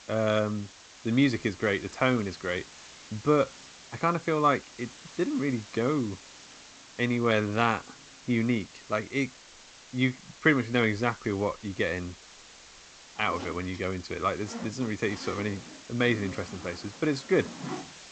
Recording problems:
garbled, watery; slightly; nothing above 8 kHz
household noises; noticeable; throughout; 15 dB below the speech
hiss; noticeable; throughout; 20 dB below the speech

